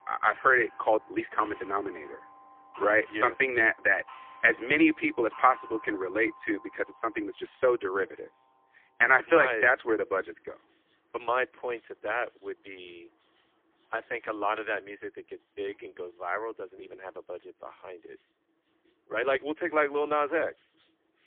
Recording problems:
phone-call audio; poor line
thin; very; fading below 300 Hz
household noises; faint; throughout; 20 dB below the speech
uneven, jittery; strongly; from 0.5 to 20 s

